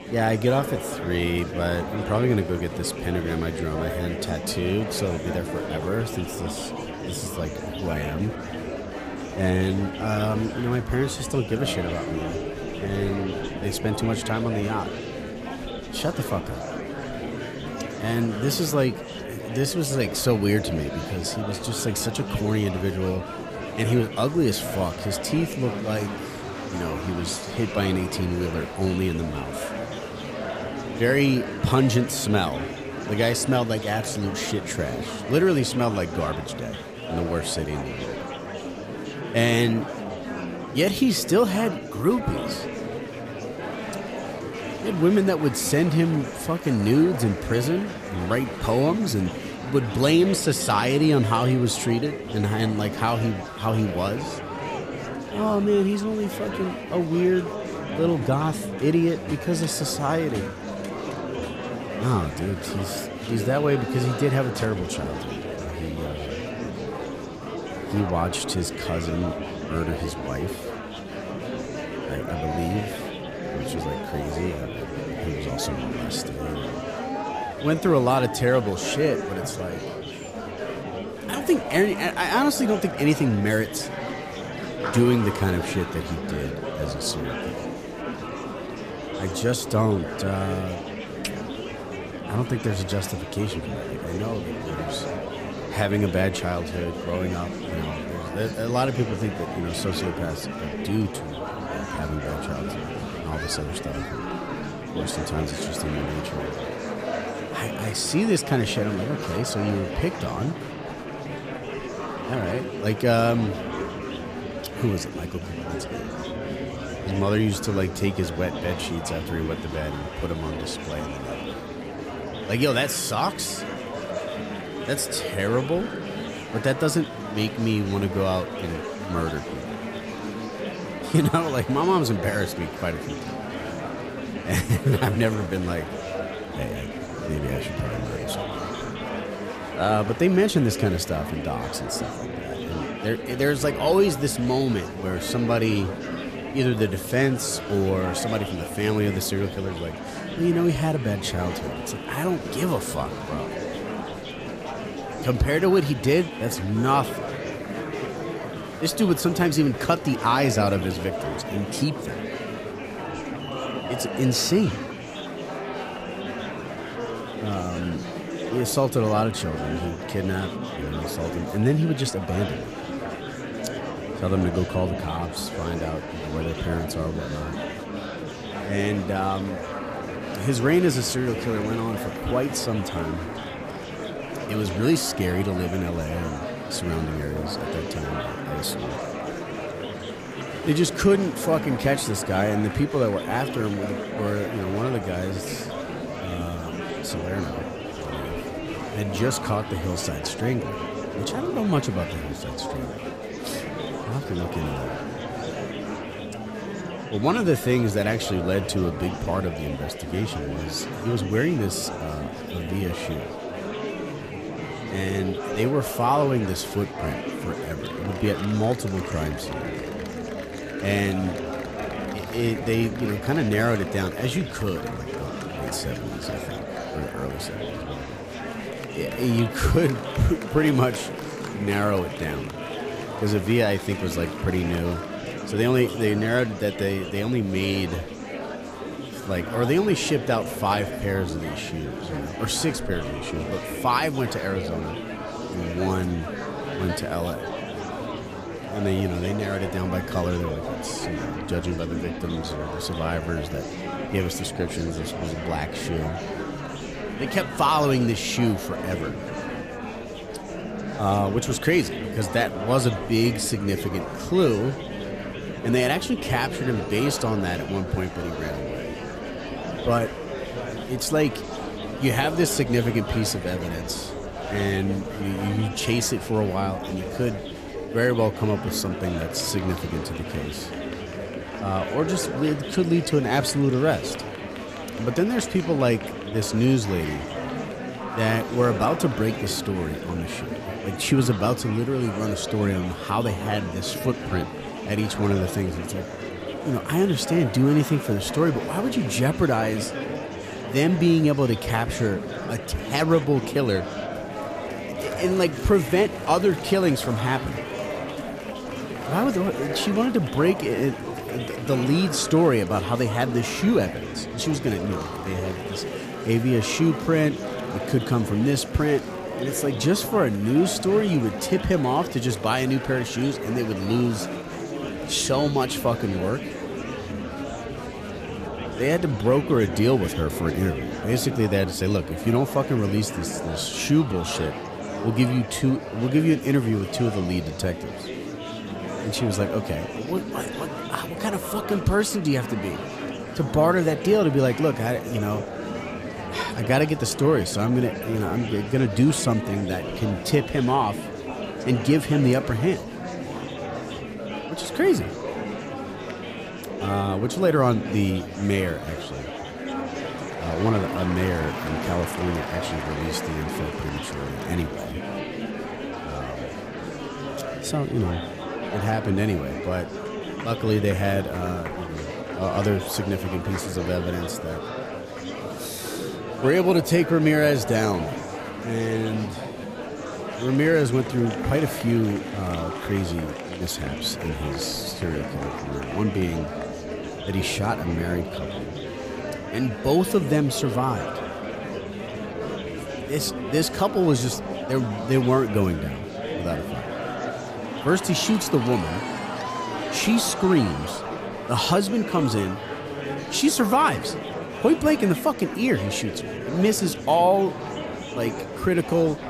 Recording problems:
murmuring crowd; loud; throughout; 7 dB below the speech

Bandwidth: 14.5 kHz